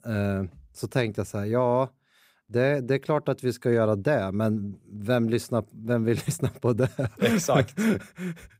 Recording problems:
none

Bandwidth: 15.5 kHz